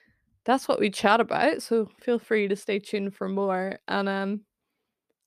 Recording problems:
none

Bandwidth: 14.5 kHz